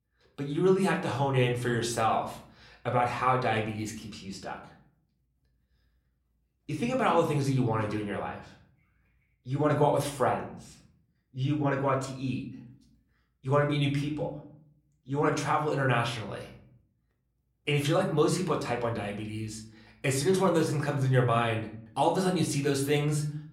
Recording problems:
room echo; slight; dies away in 0.6 s
off-mic speech; somewhat distant

